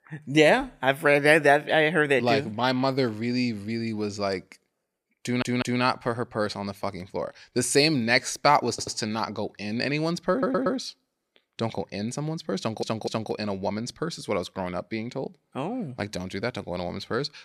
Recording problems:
audio stuttering; 4 times, first at 5 s

